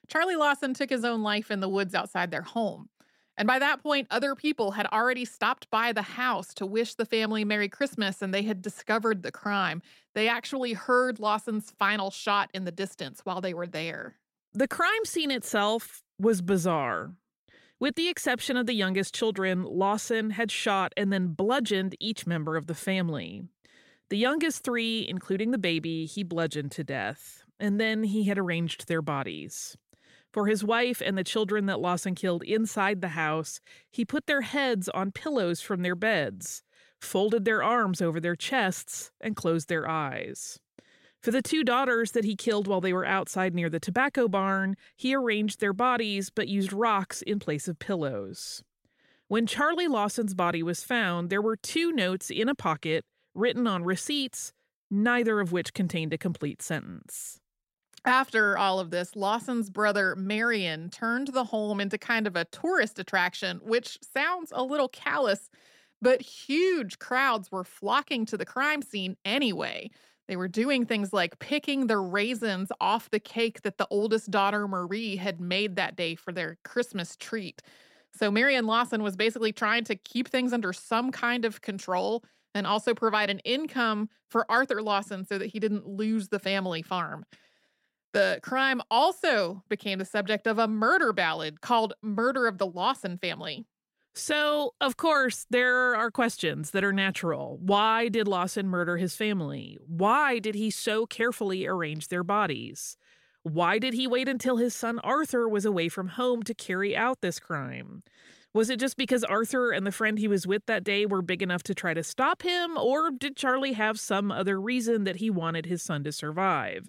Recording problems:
none

